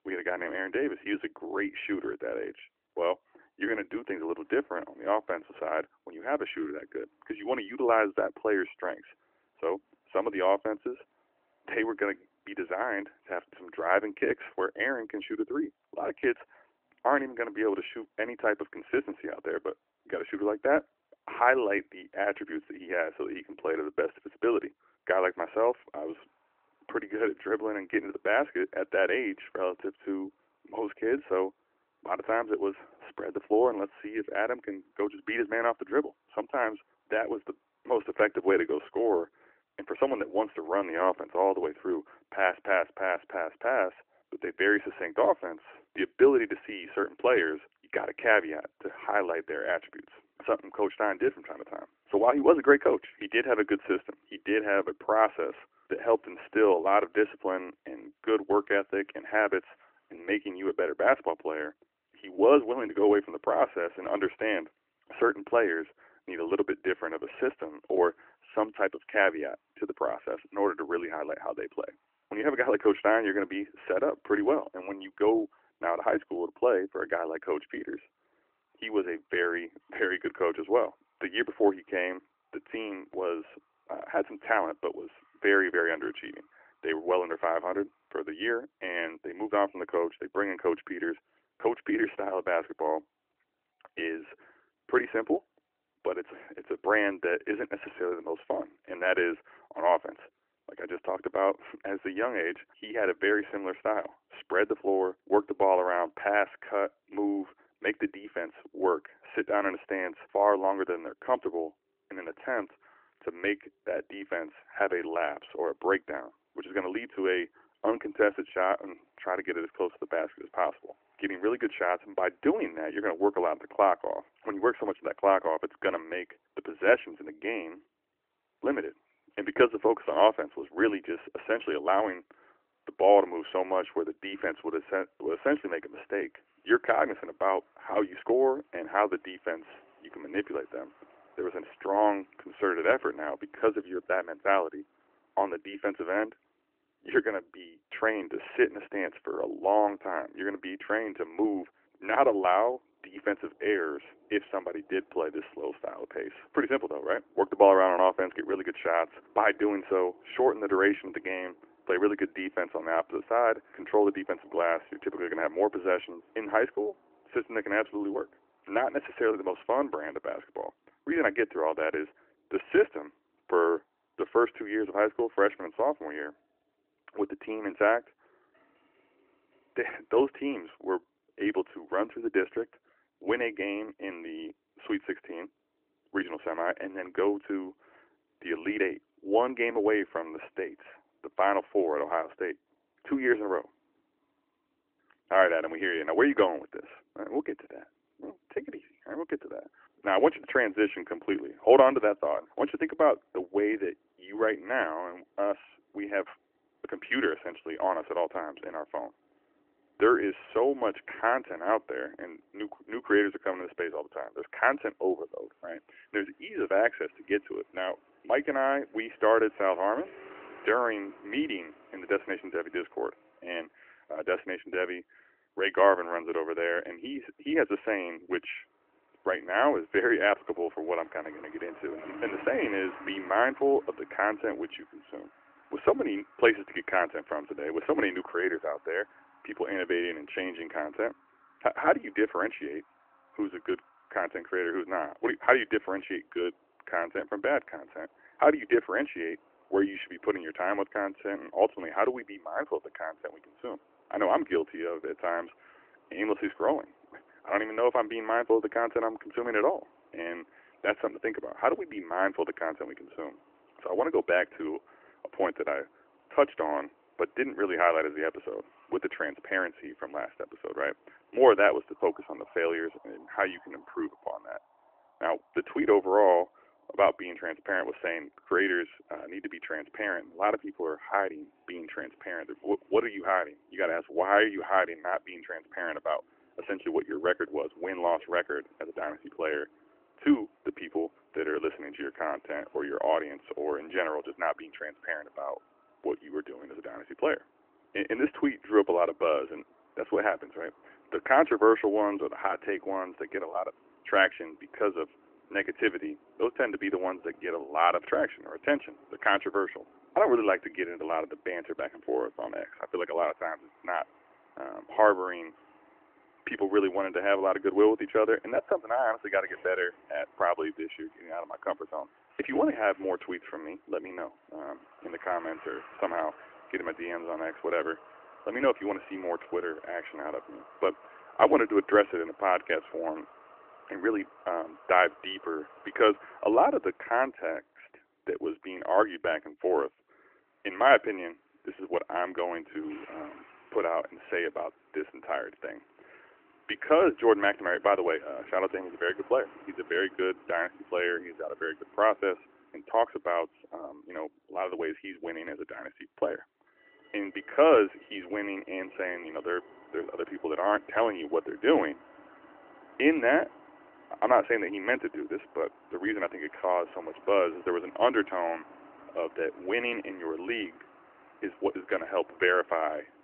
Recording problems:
phone-call audio; nothing above 3 kHz
traffic noise; faint; throughout; 25 dB below the speech

